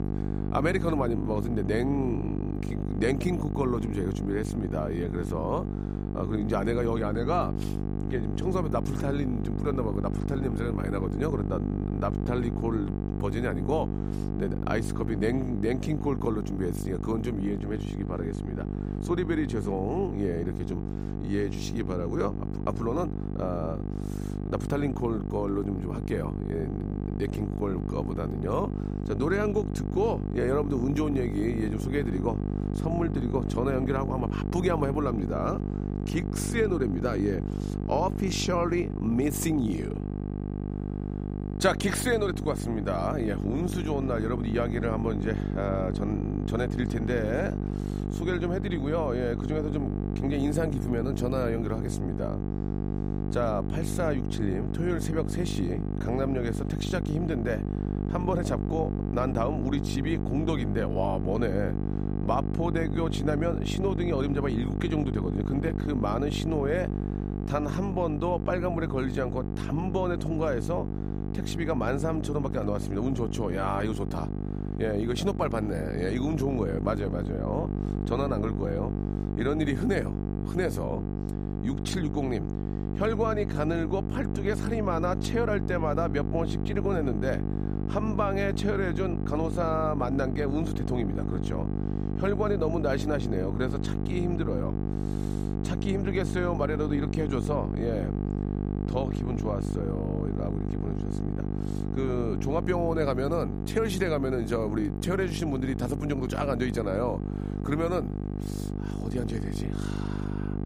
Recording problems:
electrical hum; loud; throughout; 50 Hz, 7 dB below the speech

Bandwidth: 15.5 kHz